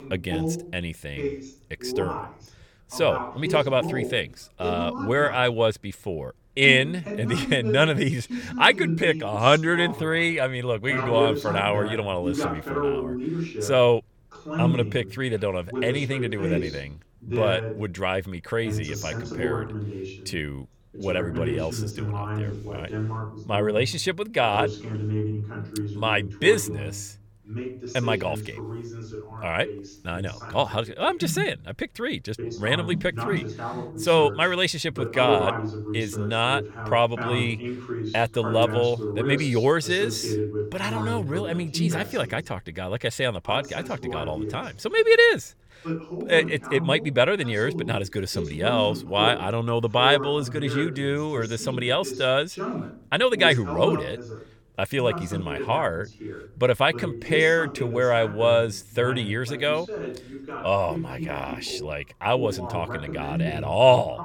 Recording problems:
voice in the background; loud; throughout; 8 dB below the speech

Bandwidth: 17.5 kHz